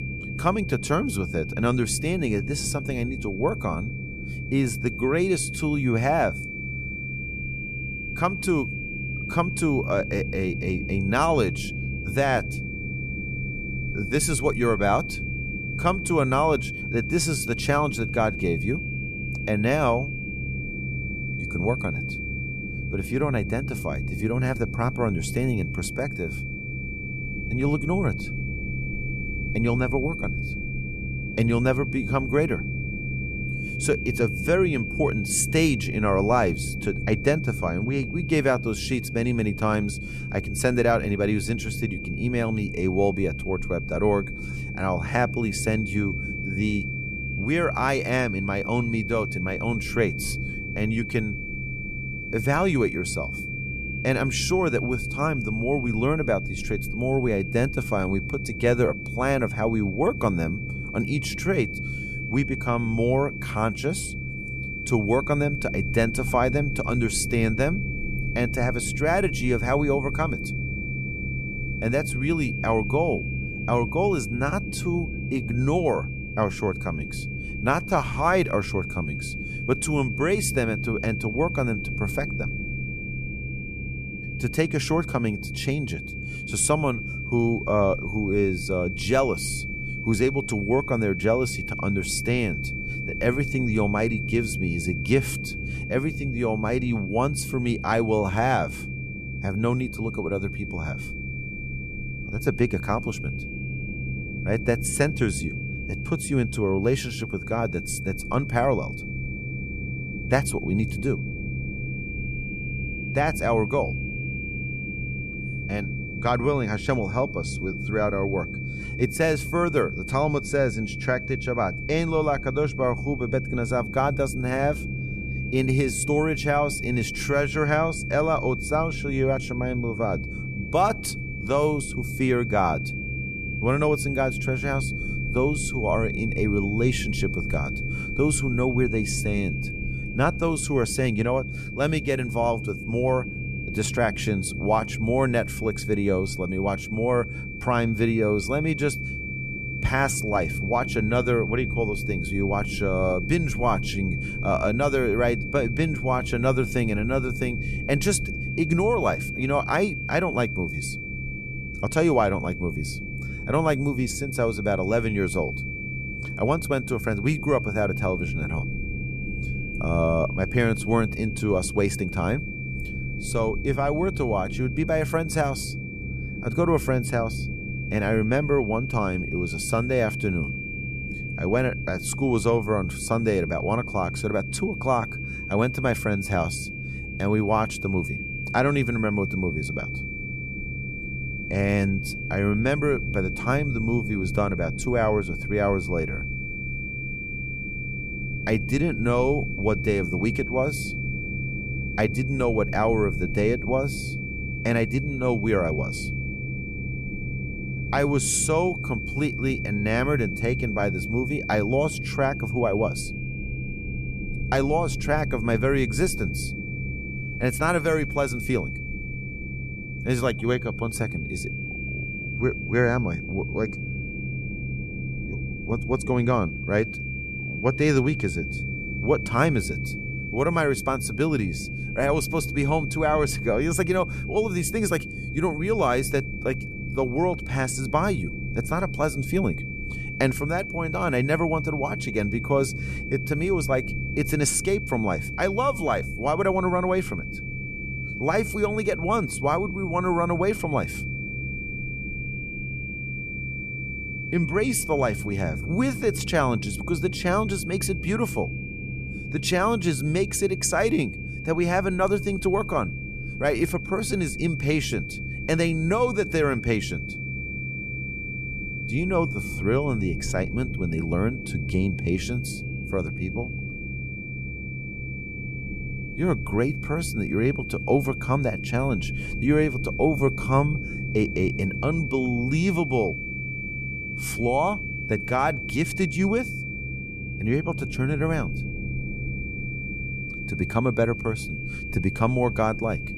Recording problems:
high-pitched whine; loud; throughout; 2.5 kHz, 8 dB below the speech
low rumble; noticeable; throughout; 15 dB below the speech

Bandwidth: 14.5 kHz